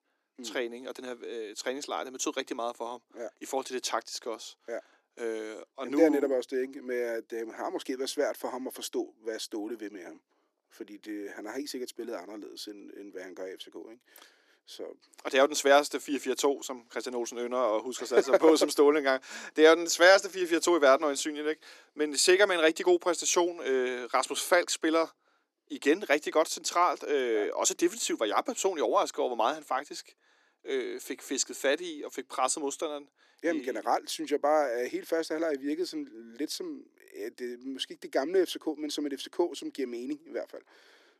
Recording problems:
thin; somewhat; fading below 300 Hz

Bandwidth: 13.5 kHz